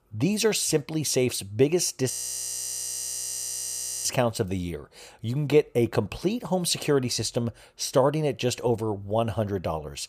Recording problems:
audio freezing; at 2 s for 2 s

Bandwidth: 15 kHz